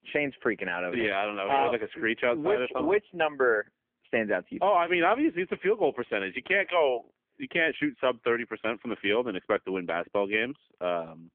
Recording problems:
phone-call audio; poor line; nothing above 3.5 kHz

